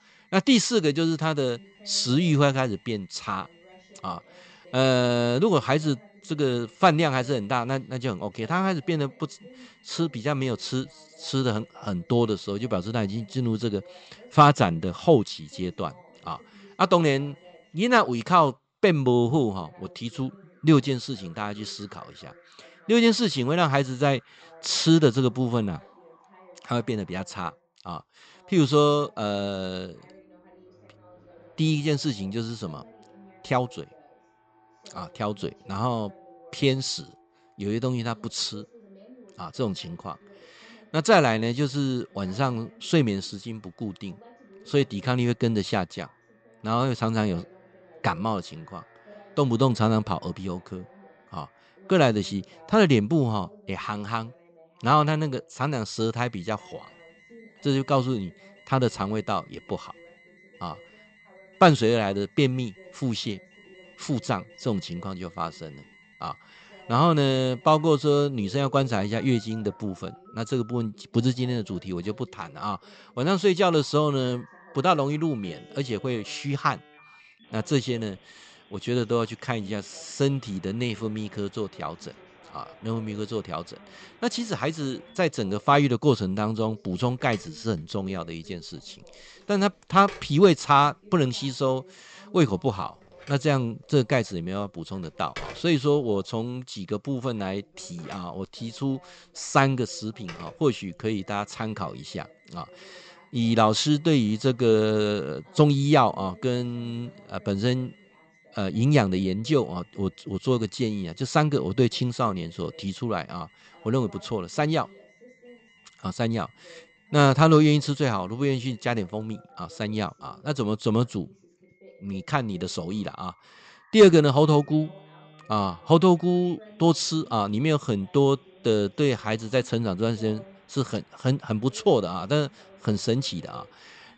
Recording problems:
high frequencies cut off; noticeable; nothing above 8 kHz
alarms or sirens; faint; throughout; 30 dB below the speech
voice in the background; faint; throughout; 30 dB below the speech

